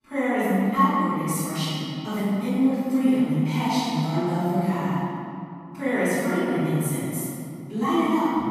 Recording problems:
room echo; strong; dies away in 2.5 s
off-mic speech; far

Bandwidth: 14.5 kHz